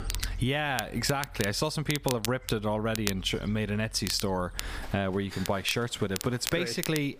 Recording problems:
squashed, flat; somewhat, background pumping
crackle, like an old record; loud; 8 dB below the speech
animal sounds; noticeable; throughout; 15 dB below the speech

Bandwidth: 15 kHz